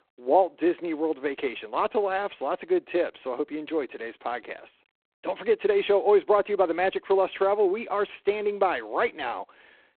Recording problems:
phone-call audio; poor line; nothing above 3.5 kHz

